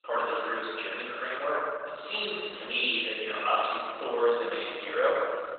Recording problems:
room echo; strong; dies away in 1.9 s
off-mic speech; far
garbled, watery; badly; nothing above 4 kHz
thin; very; fading below 500 Hz
muffled; very slightly; fading above 3 kHz

